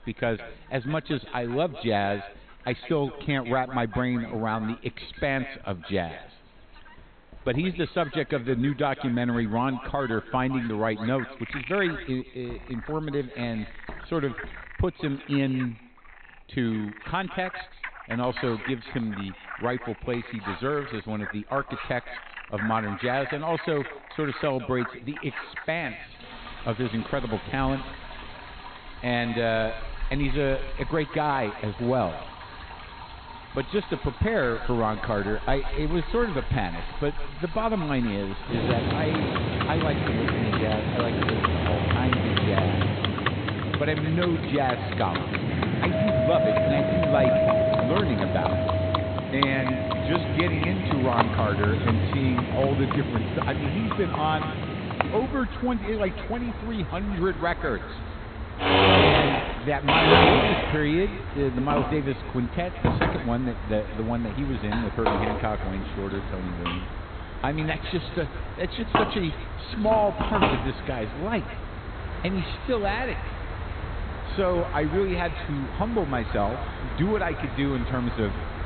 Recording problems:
high frequencies cut off; severe; nothing above 4 kHz
echo of what is said; noticeable; throughout; 160 ms later, 15 dB below the speech
household noises; very loud; throughout; 1 dB above the speech
animal sounds; loud; throughout; 2 dB below the speech

